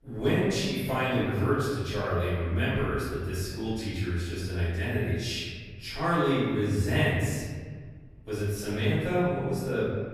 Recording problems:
room echo; strong; dies away in 1.5 s
off-mic speech; far

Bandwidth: 14.5 kHz